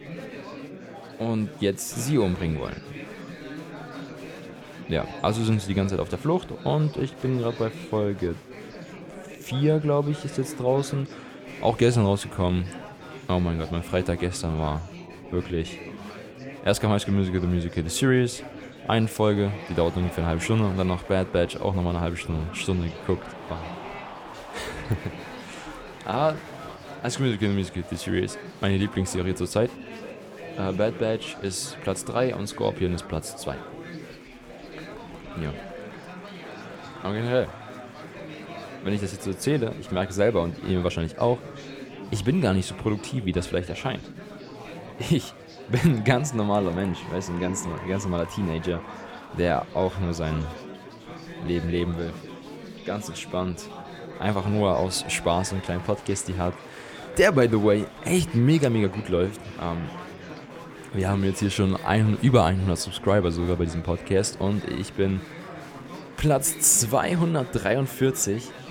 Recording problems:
chatter from many people; noticeable; throughout; 15 dB below the speech

